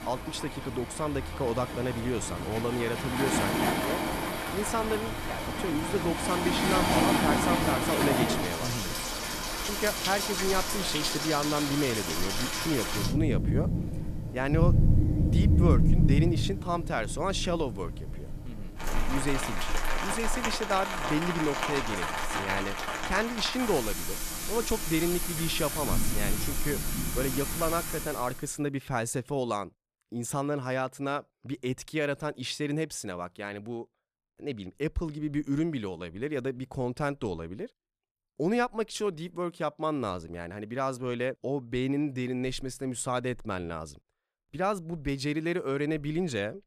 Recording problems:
rain or running water; very loud; until 28 s; 2 dB above the speech

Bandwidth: 14.5 kHz